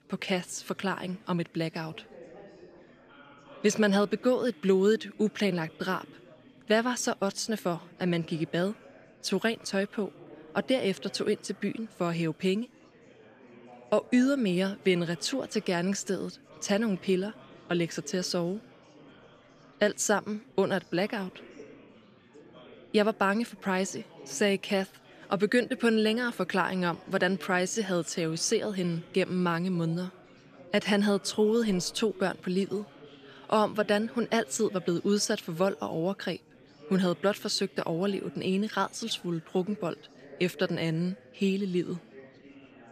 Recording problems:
chatter from many people; faint; throughout; 20 dB below the speech

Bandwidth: 14.5 kHz